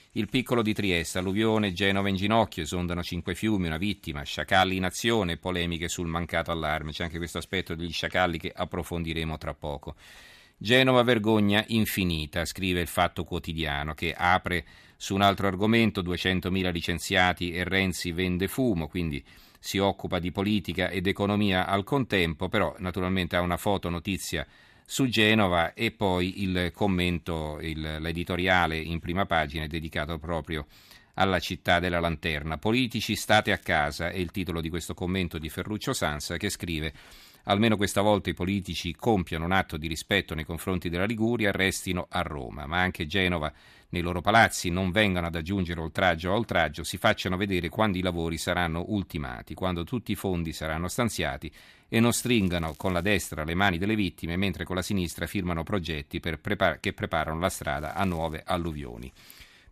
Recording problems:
crackling; faint; 4 times, first at 14 s; 30 dB below the speech

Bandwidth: 14.5 kHz